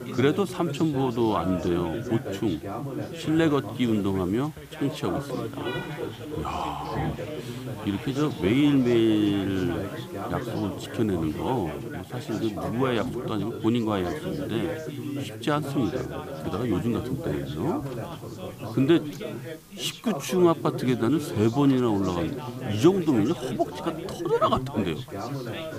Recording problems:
background chatter; loud; throughout; 3 voices, 8 dB below the speech
animal sounds; noticeable; throughout; 20 dB below the speech
traffic noise; faint; throughout; 20 dB below the speech
hiss; faint; throughout; 25 dB below the speech

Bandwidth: 15 kHz